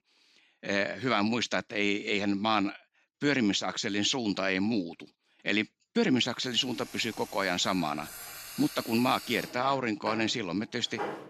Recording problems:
household noises; noticeable; from 6.5 s on; 15 dB below the speech

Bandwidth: 15 kHz